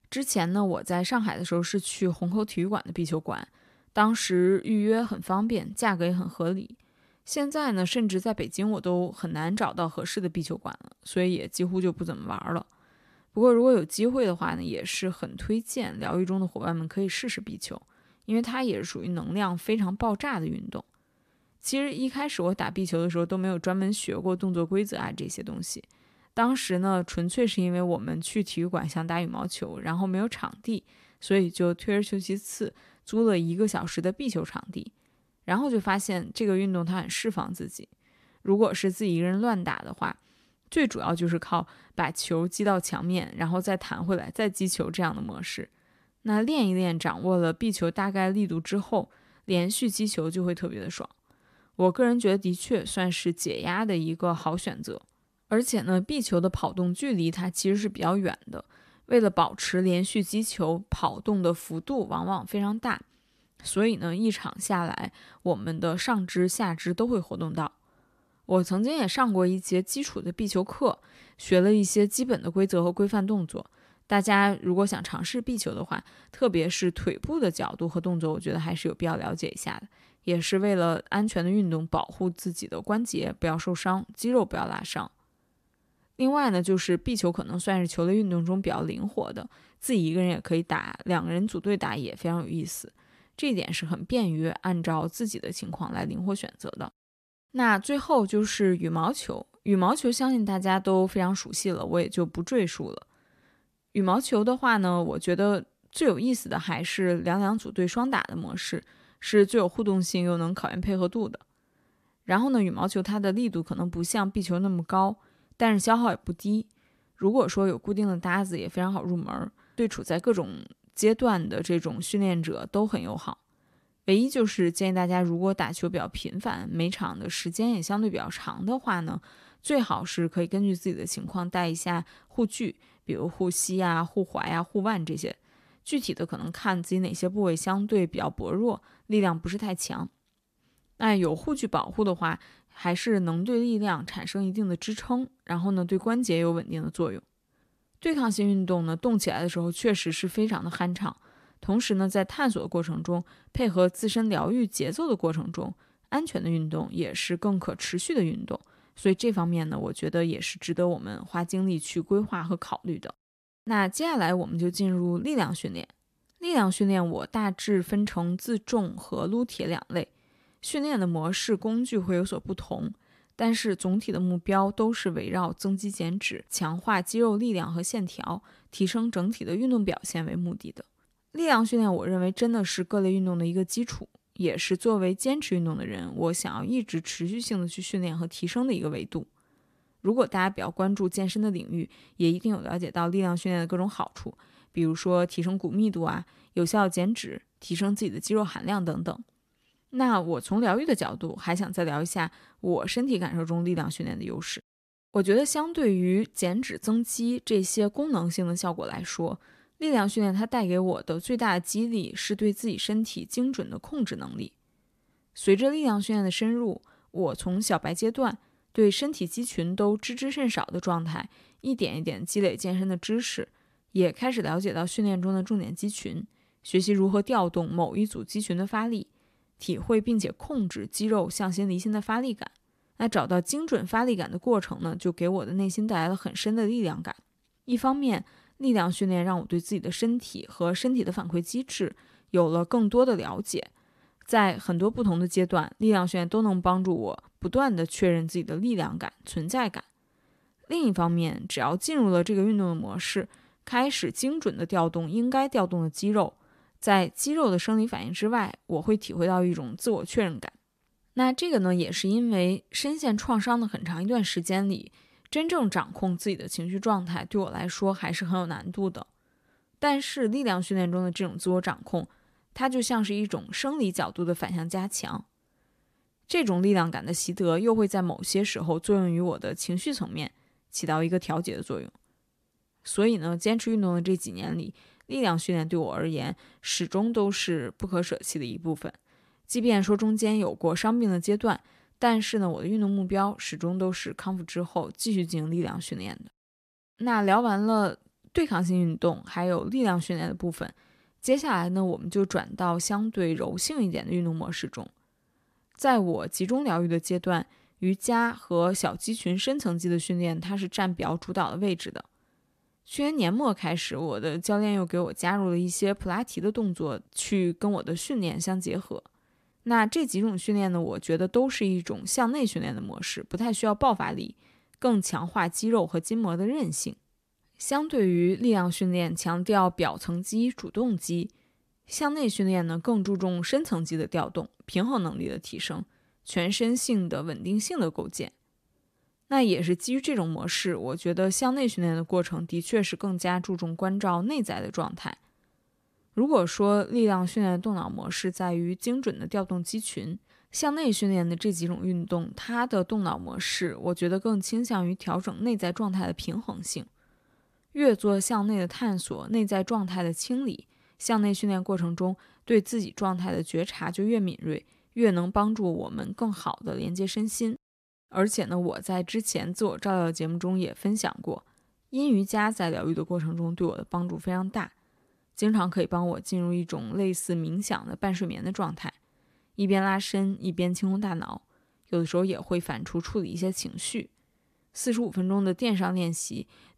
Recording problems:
none

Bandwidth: 14.5 kHz